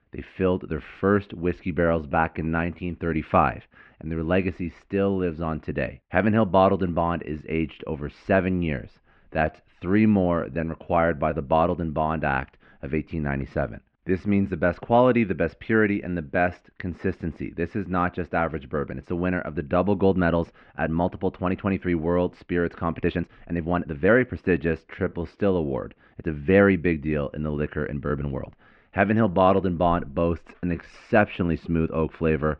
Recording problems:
muffled; very; fading above 2.5 kHz
uneven, jittery; strongly; from 2 to 31 s

